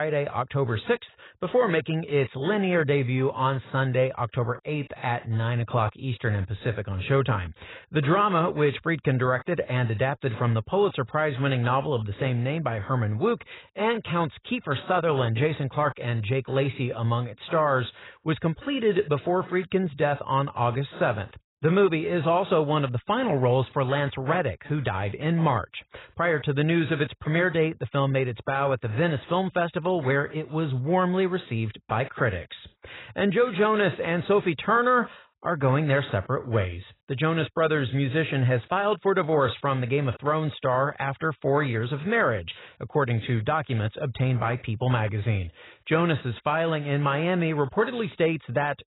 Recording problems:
garbled, watery; badly; nothing above 4 kHz
abrupt cut into speech; at the start

